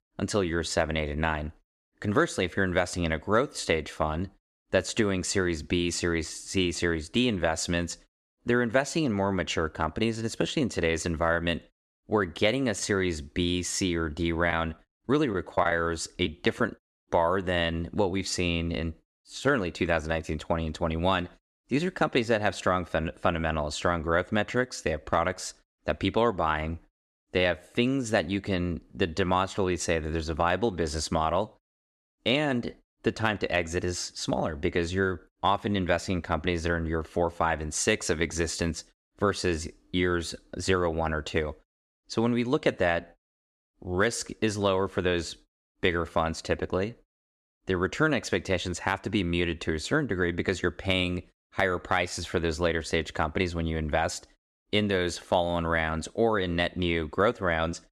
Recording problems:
choppy; very; from 15 to 17 s; 6% of the speech affected

